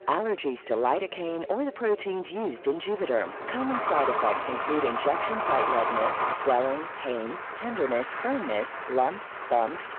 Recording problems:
phone-call audio
distortion; slight; 15 dB below the speech
traffic noise; loud; from 3 s on; 1 dB below the speech
murmuring crowd; noticeable; throughout; 20 dB below the speech

